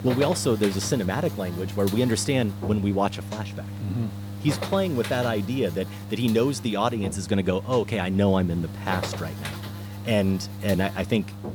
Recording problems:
electrical hum; noticeable; throughout; 50 Hz, 10 dB below the speech

